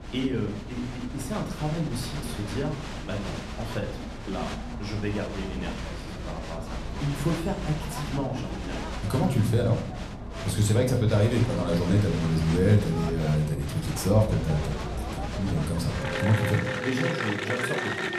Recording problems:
room echo; slight; dies away in 0.5 s
off-mic speech; somewhat distant
crowd noise; loud; throughout; 6 dB below the speech

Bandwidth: 13.5 kHz